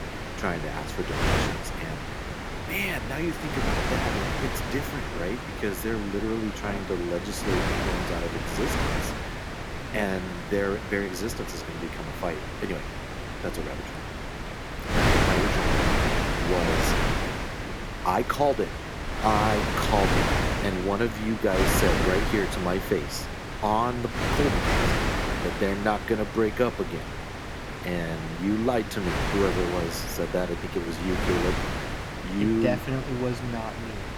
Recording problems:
wind noise on the microphone; heavy; as loud as the speech

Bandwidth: 18.5 kHz